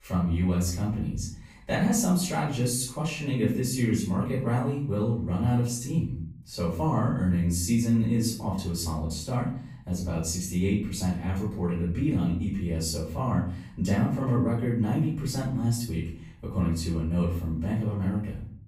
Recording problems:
off-mic speech; far
room echo; noticeable; dies away in 0.5 s

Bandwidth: 15 kHz